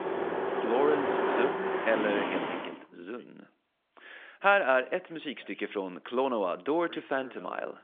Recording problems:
phone-call audio; nothing above 3.5 kHz
traffic noise; loud; until 2.5 s; 1 dB below the speech
voice in the background; faint; throughout; 25 dB below the speech

